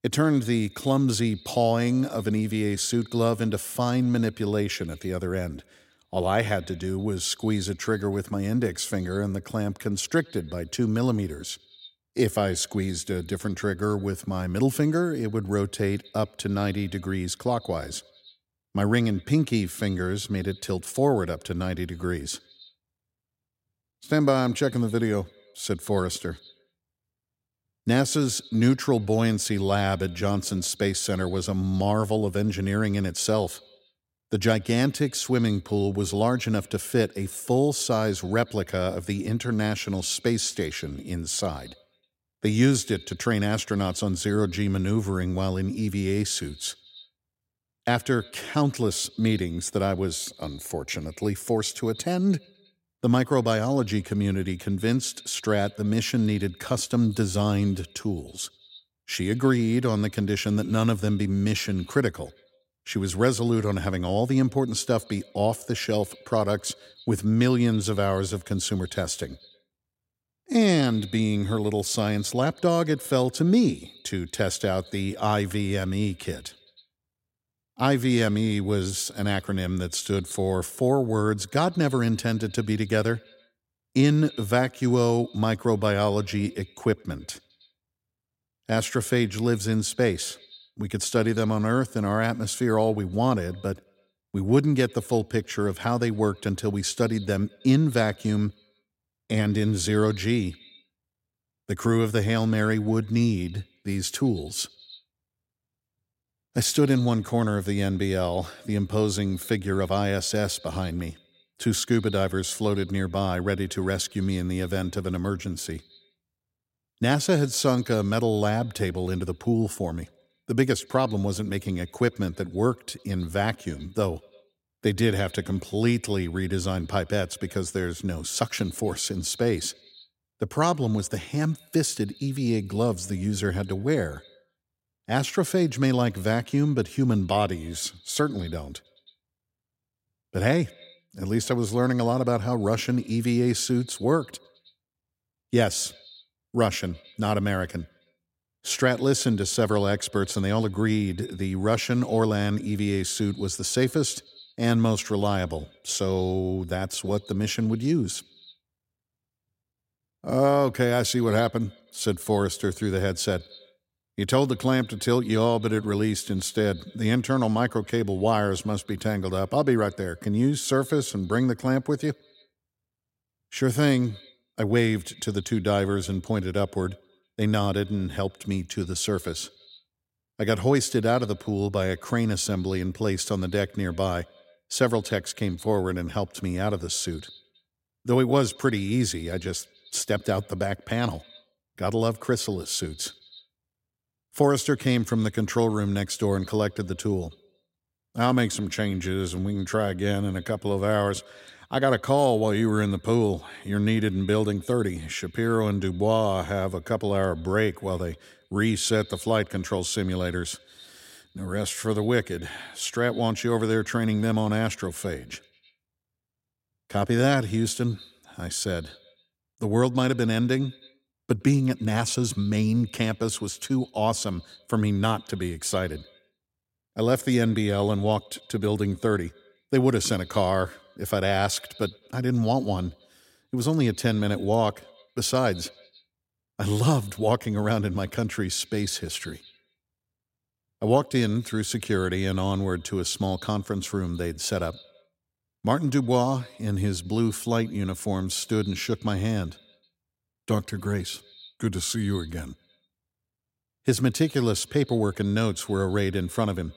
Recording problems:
echo of what is said; faint; throughout; 100 ms later, 25 dB below the speech

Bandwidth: 16 kHz